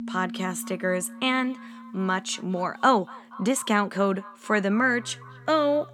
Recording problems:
echo of what is said; faint; throughout; 240 ms later, 20 dB below the speech
background music; noticeable; throughout; 20 dB below the speech

